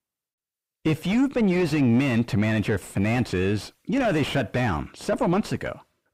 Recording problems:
distortion; heavy; 7 dB below the speech

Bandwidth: 15.5 kHz